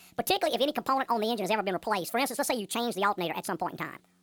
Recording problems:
wrong speed and pitch; too fast and too high; 1.5 times normal speed

